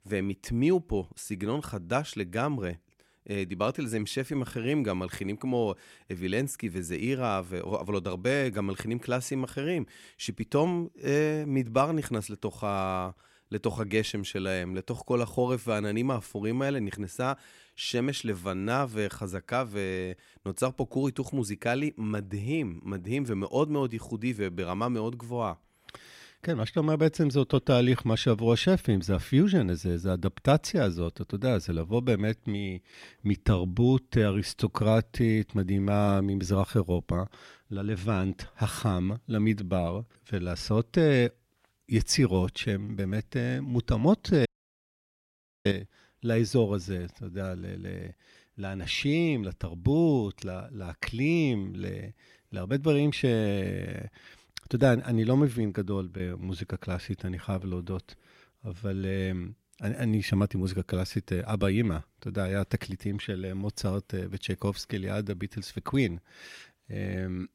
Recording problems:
audio cutting out; at 44 s for 1 s

